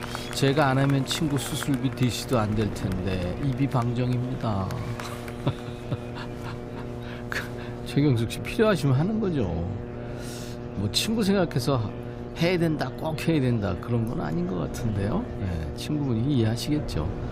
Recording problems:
electrical hum; noticeable; throughout; 60 Hz, 10 dB below the speech
murmuring crowd; noticeable; throughout; 15 dB below the speech
wind noise on the microphone; occasional gusts; 20 dB below the speech

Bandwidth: 15.5 kHz